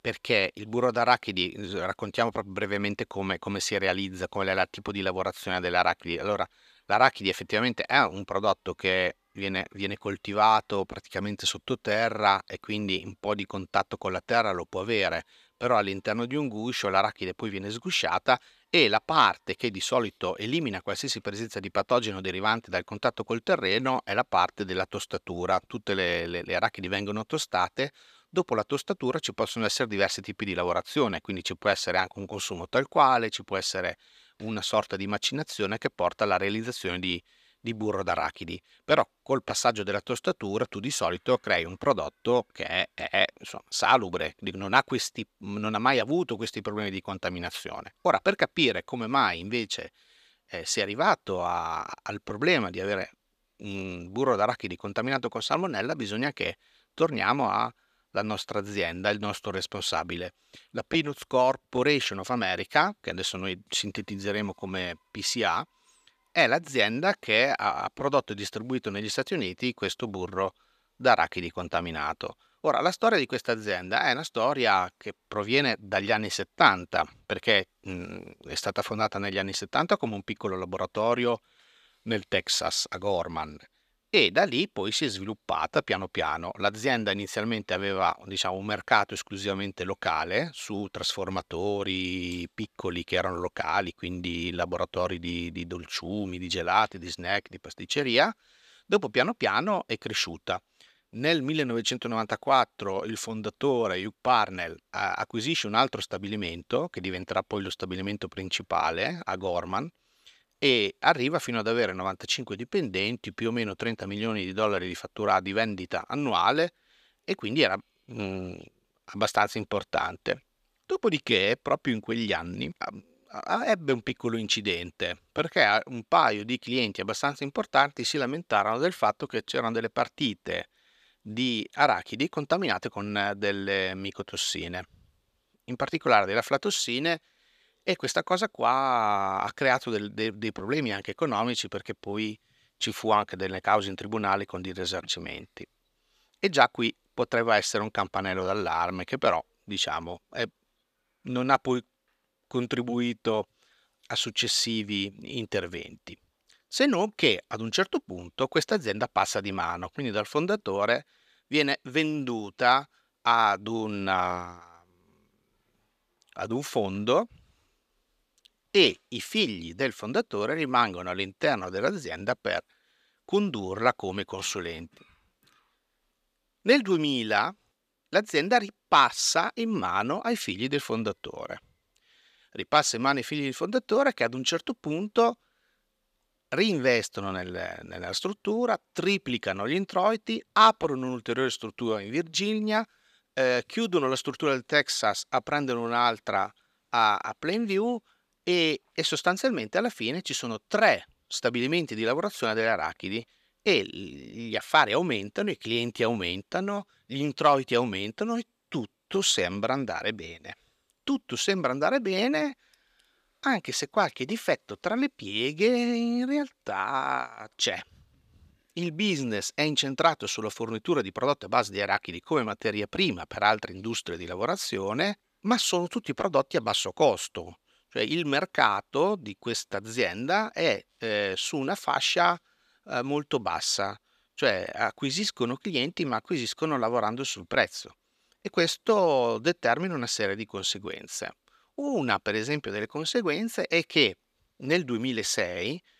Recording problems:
thin; somewhat; fading below 600 Hz

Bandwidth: 14.5 kHz